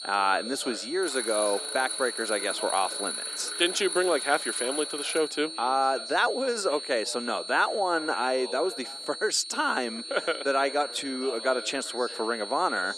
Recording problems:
thin; somewhat; fading below 350 Hz
high-pitched whine; loud; throughout; 4.5 kHz, 8 dB below the speech
background chatter; noticeable; throughout; 3 voices, 20 dB below the speech
alarm; noticeable; from 1 to 5.5 s; peak 3 dB below the speech

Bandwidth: 15 kHz